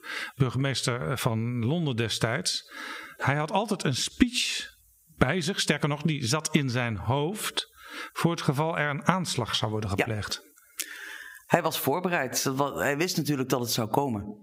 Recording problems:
squashed, flat; heavily

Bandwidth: 15.5 kHz